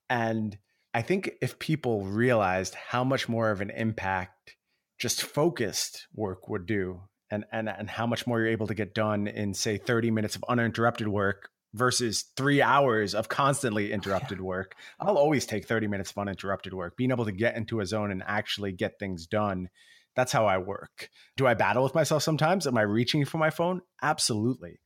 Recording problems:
none

